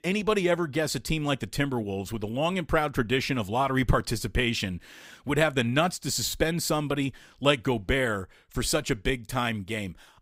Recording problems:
none

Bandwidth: 15.5 kHz